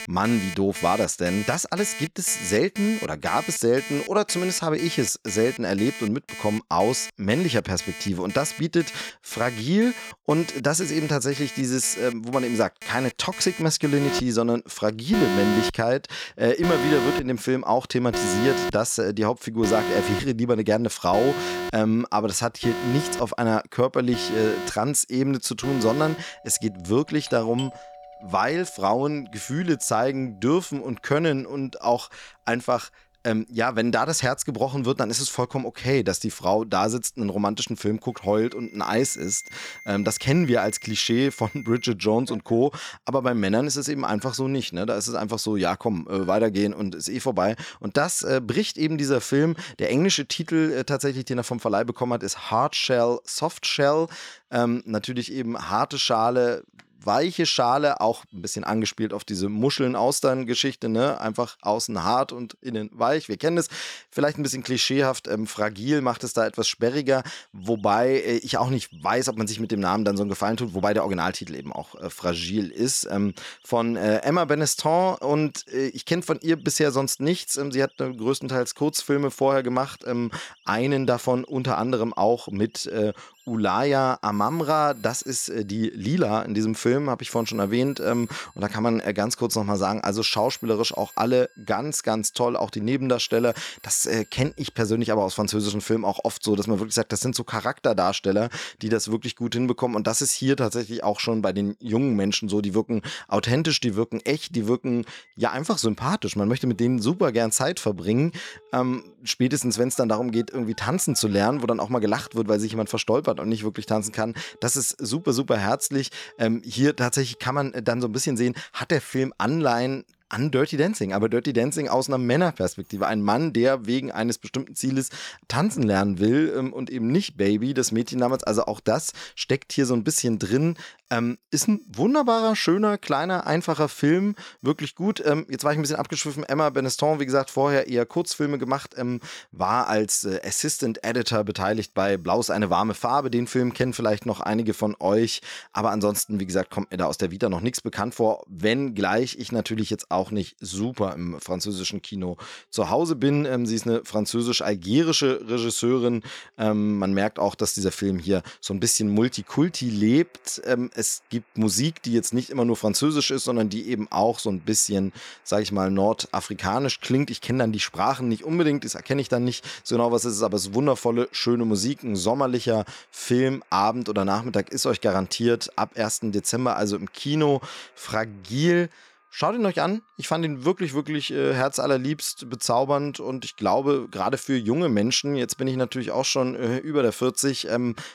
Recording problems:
alarms or sirens; loud; throughout; 10 dB below the speech

